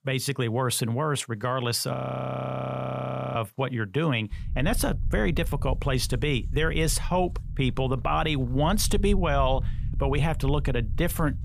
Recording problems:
low rumble; faint; from 4.5 s on; 20 dB below the speech
audio freezing; at 2 s for 1.5 s

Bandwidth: 14.5 kHz